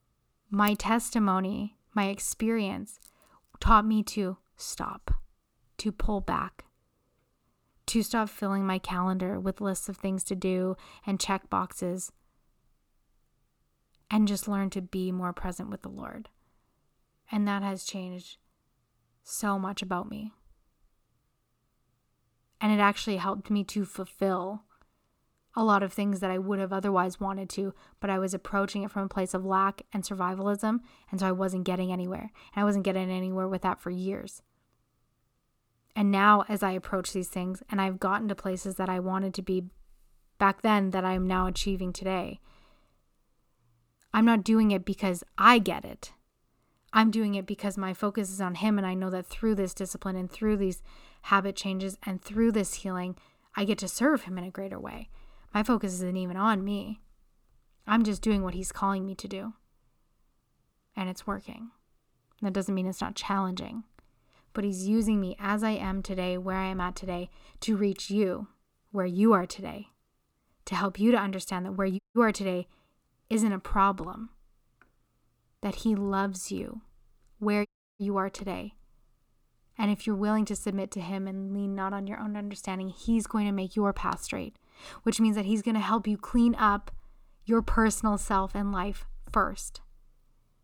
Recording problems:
audio cutting out; at 1:12 and at 1:18

